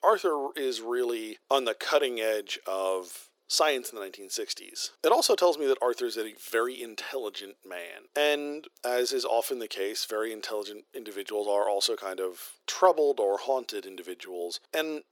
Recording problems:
thin; very; fading below 400 Hz

